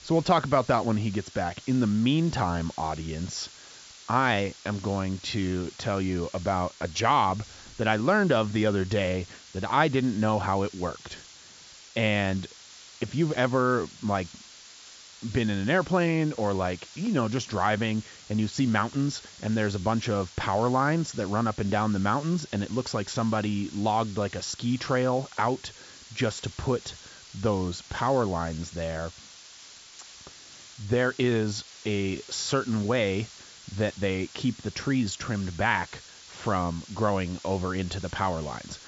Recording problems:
high frequencies cut off; noticeable; nothing above 7.5 kHz
hiss; noticeable; throughout; 20 dB below the speech

